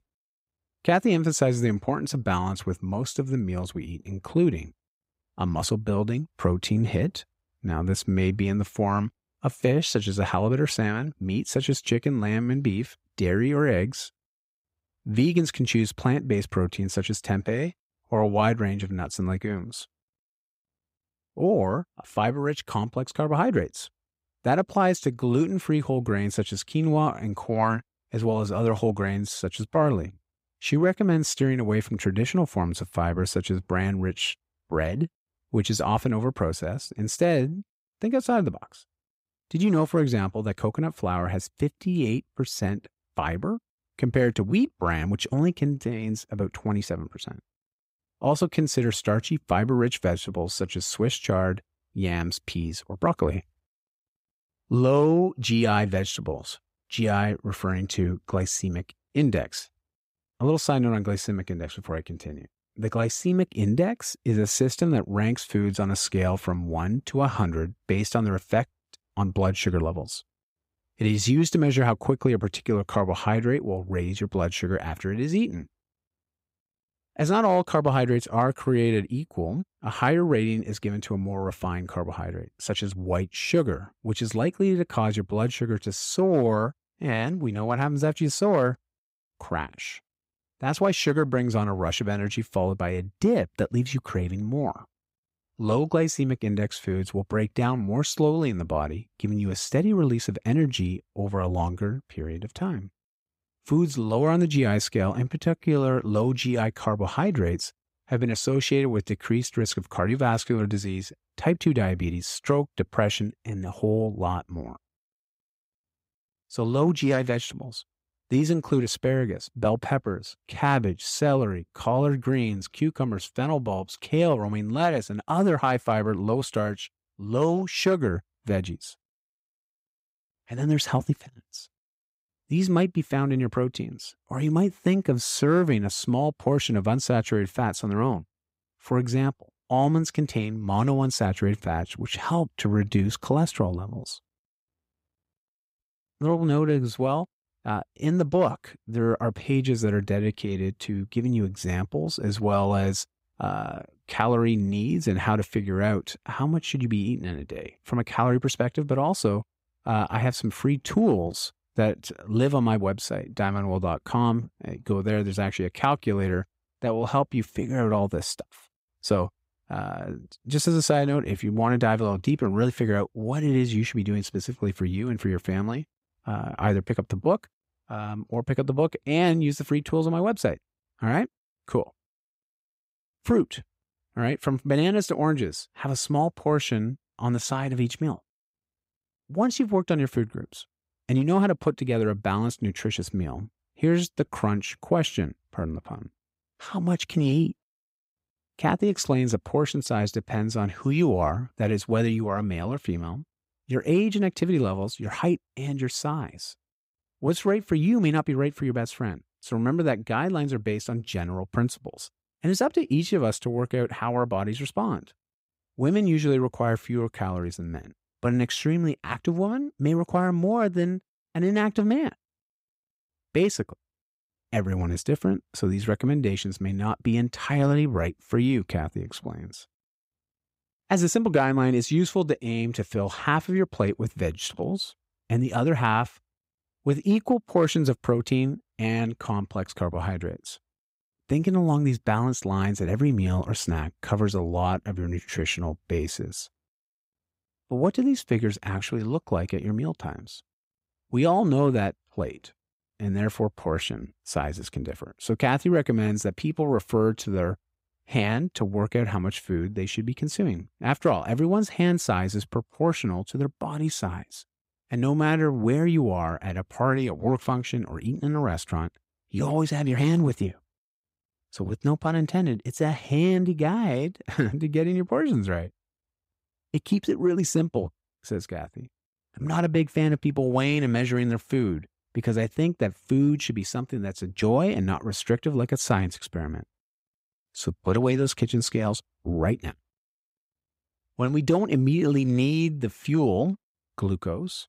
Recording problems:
none

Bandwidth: 15.5 kHz